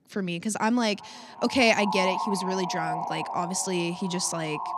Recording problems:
echo of what is said; strong; throughout; 380 ms later, 7 dB below the speech

